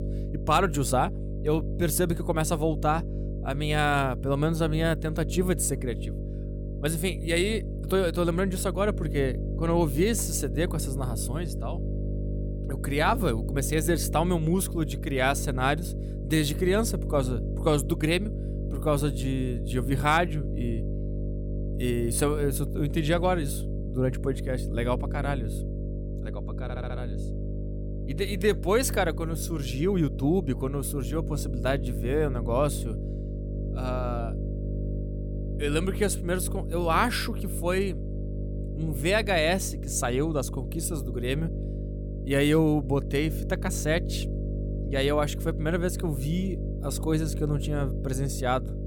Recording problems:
electrical hum; noticeable; throughout; 50 Hz, 15 dB below the speech
audio stuttering; at 27 s

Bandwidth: 17.5 kHz